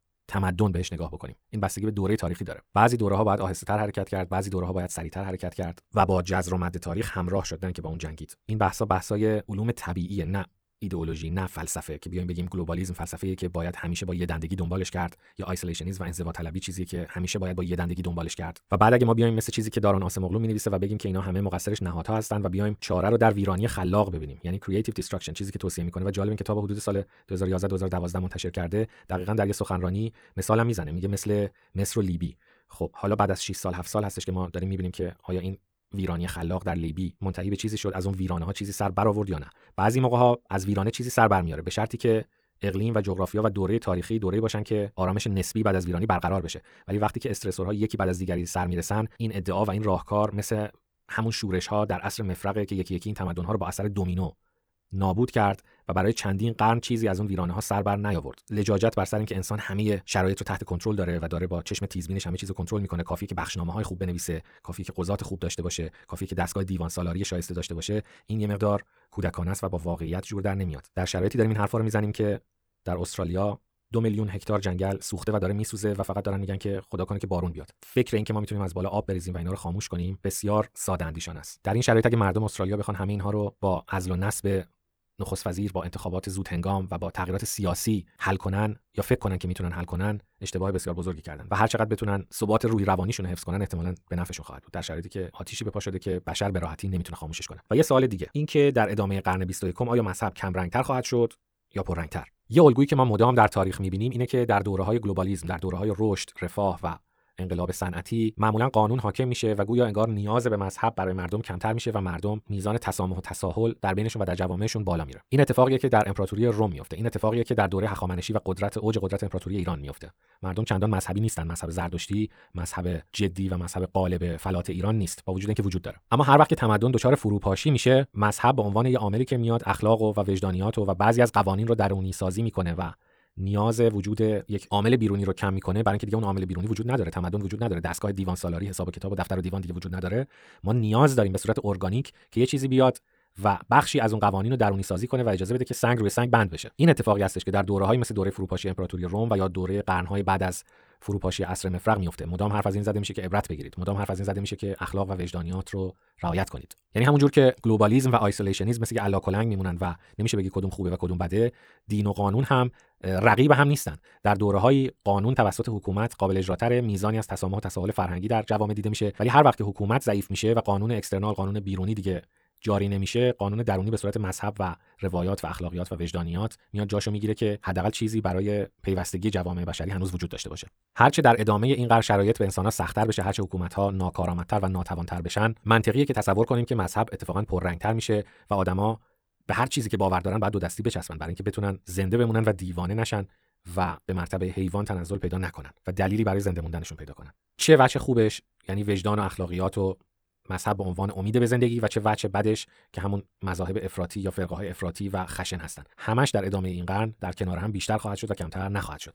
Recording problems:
wrong speed, natural pitch; too fast; 1.7 times normal speed

